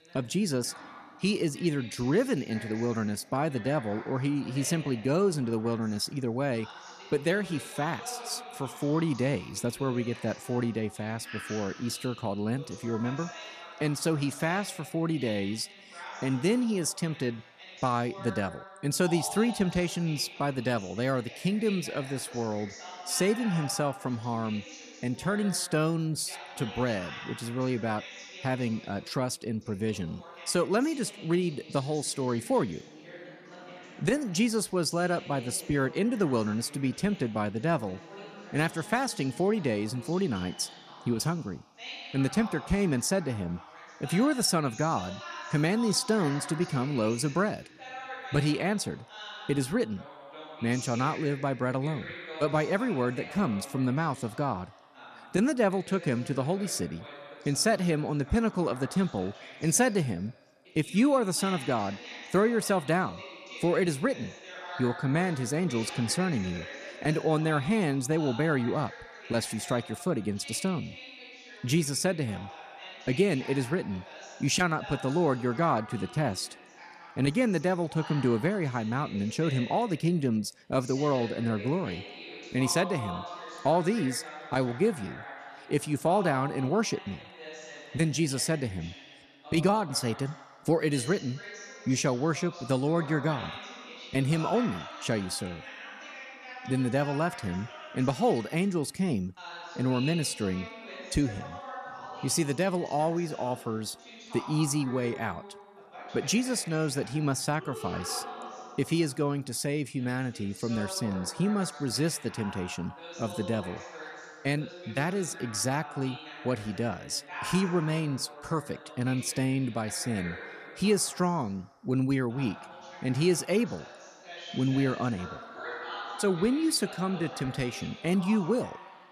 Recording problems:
voice in the background; noticeable; throughout; 15 dB below the speech

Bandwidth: 14 kHz